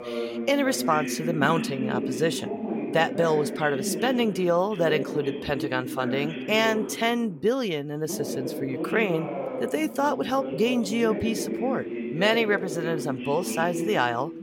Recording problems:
voice in the background; loud; throughout; 6 dB below the speech

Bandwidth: 16.5 kHz